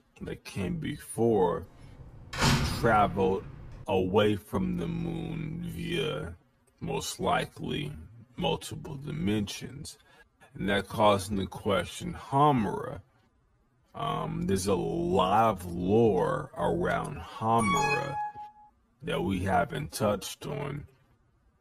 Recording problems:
wrong speed, natural pitch; too slow; 0.5 times normal speed
door banging; loud; from 2.5 to 3.5 s; peak 4 dB above the speech
alarm; loud; at 18 s; peak 2 dB above the speech

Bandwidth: 14.5 kHz